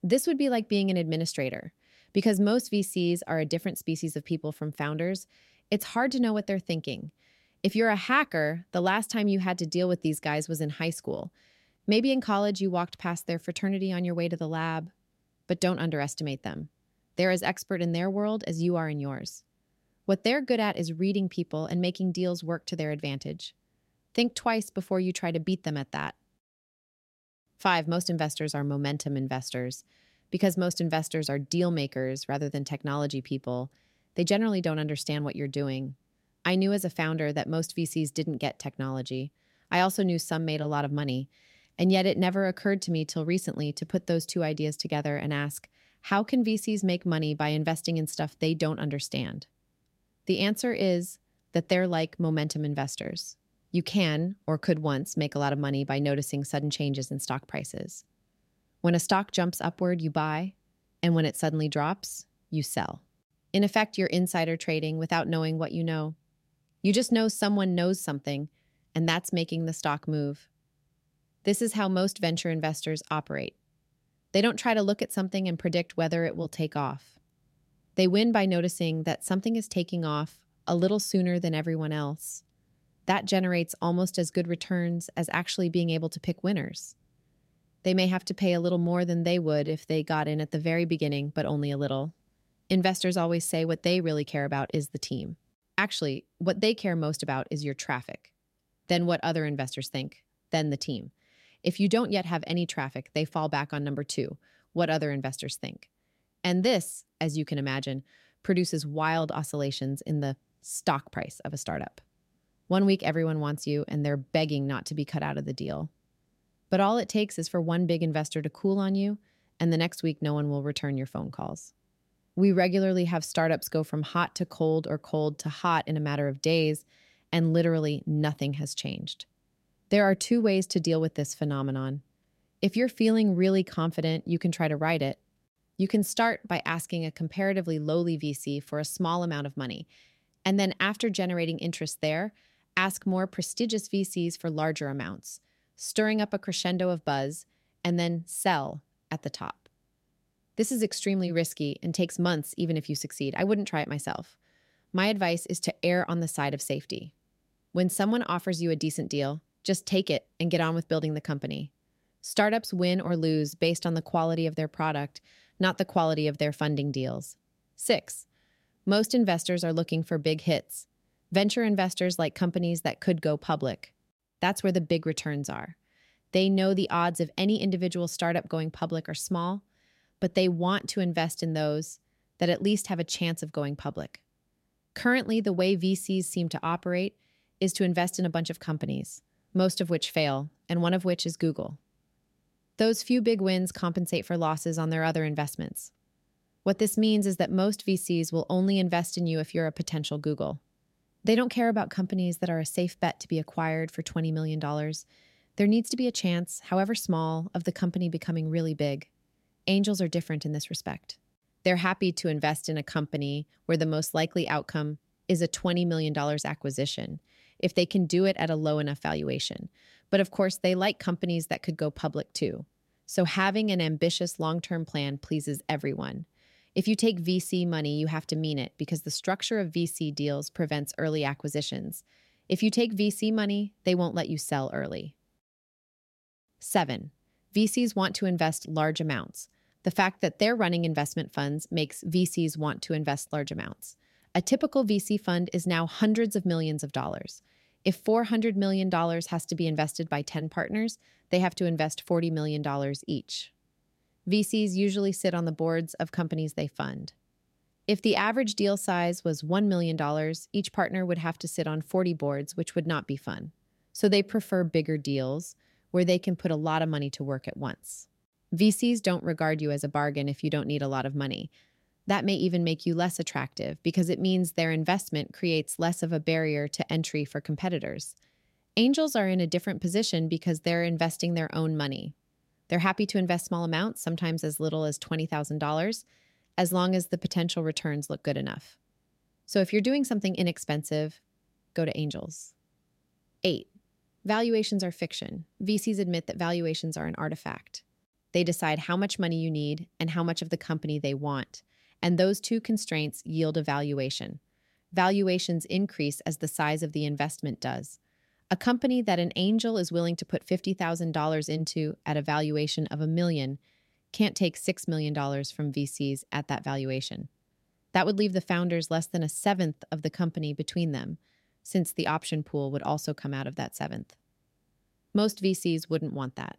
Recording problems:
none

